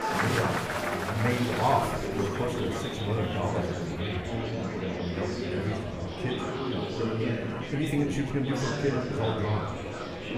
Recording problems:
room echo; slight; dies away in 0.7 s
off-mic speech; somewhat distant
murmuring crowd; loud; throughout; as loud as the speech
background music; faint; throughout; 25 dB below the speech

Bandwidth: 15 kHz